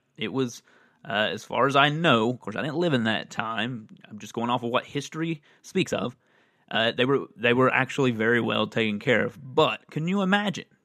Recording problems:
uneven, jittery; strongly; from 1 to 9.5 s

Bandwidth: 13.5 kHz